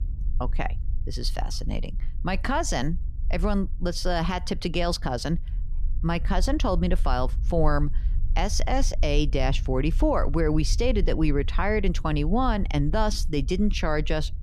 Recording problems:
low rumble; faint; throughout; 25 dB below the speech

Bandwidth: 14.5 kHz